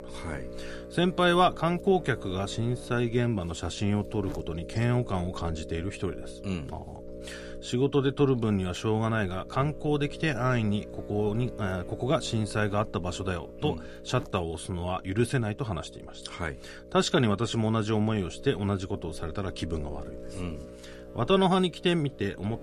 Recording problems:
electrical hum; noticeable; throughout; 60 Hz, 15 dB below the speech

